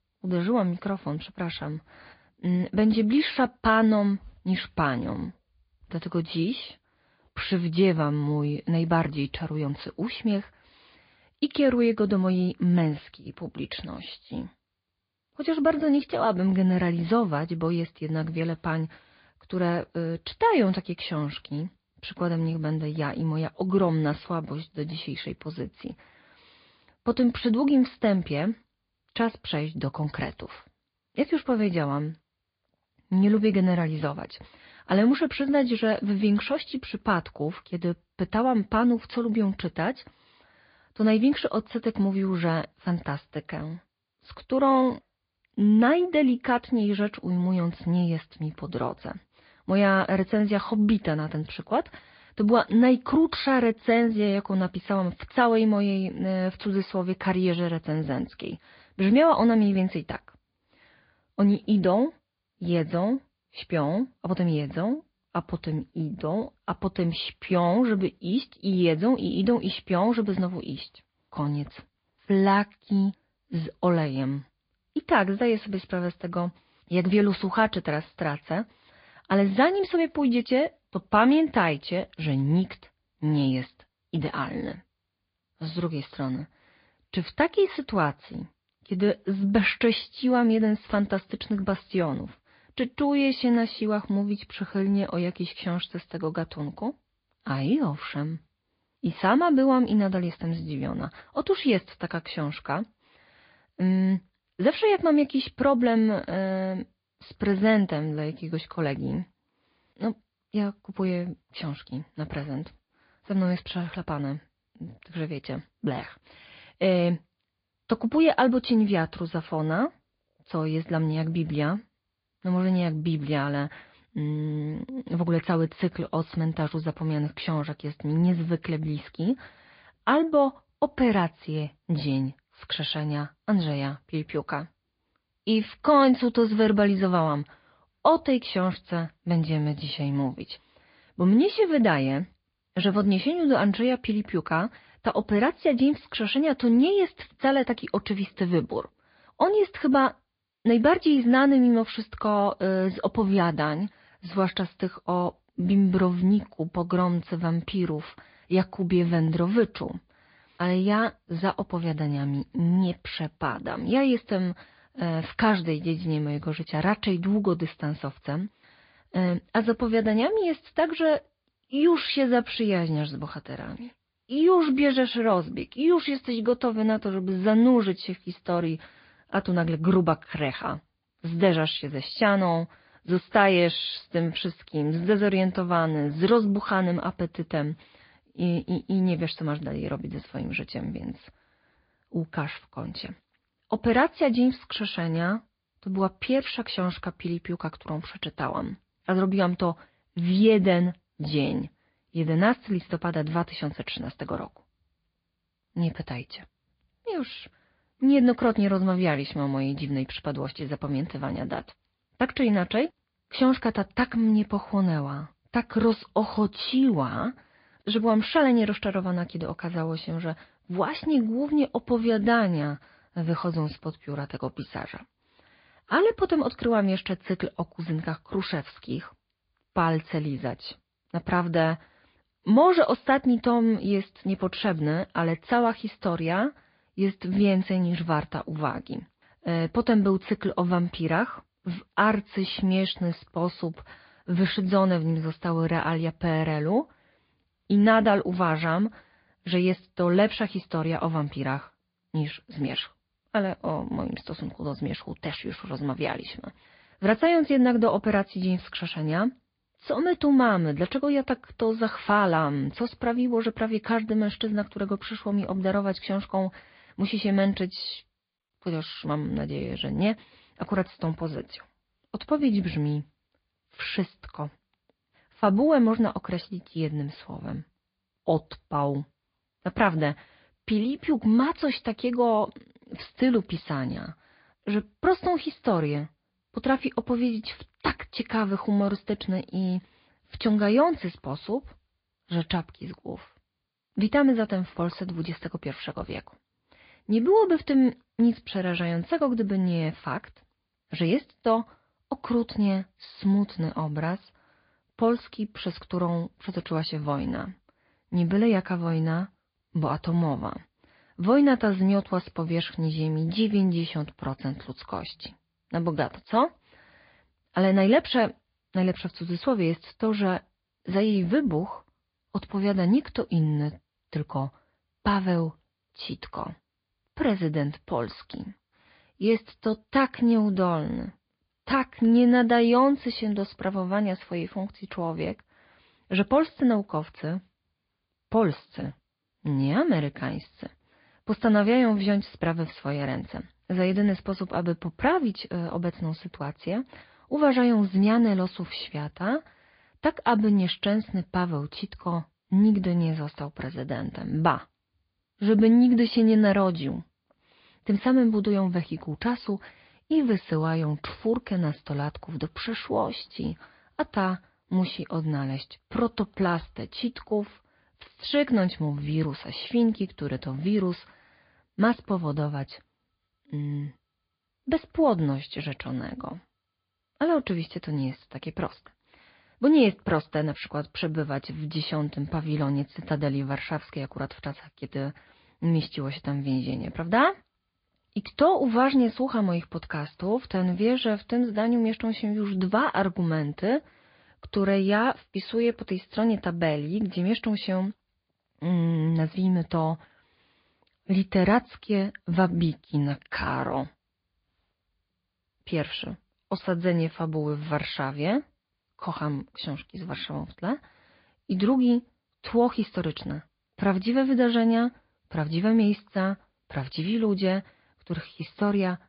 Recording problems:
high frequencies cut off; severe; nothing above 5 kHz
garbled, watery; slightly

